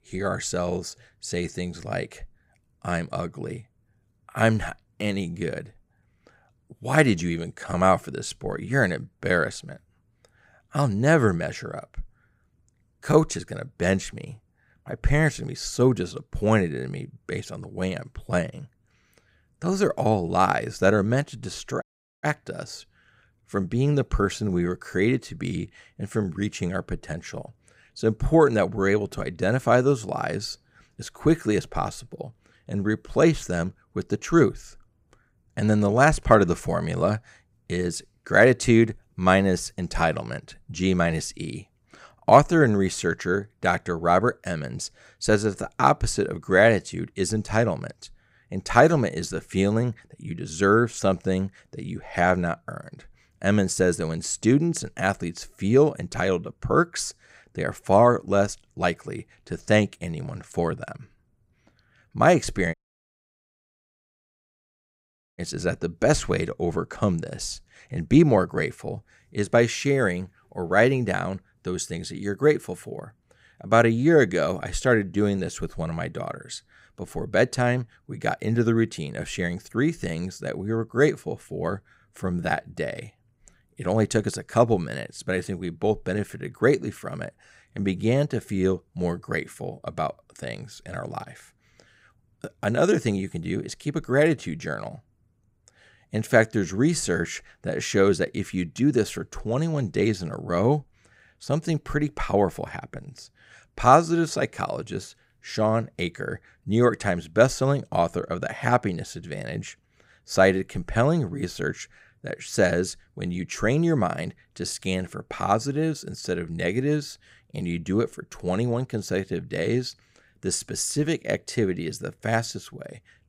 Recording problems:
audio cutting out; at 22 s and at 1:03 for 2.5 s

